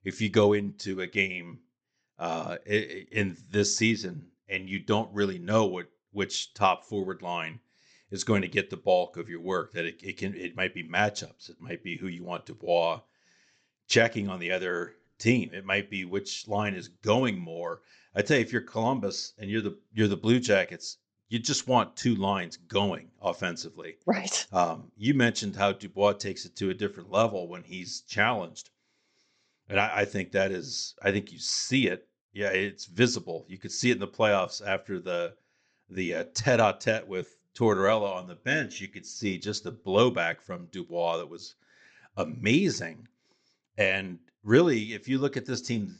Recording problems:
high frequencies cut off; noticeable; nothing above 8 kHz

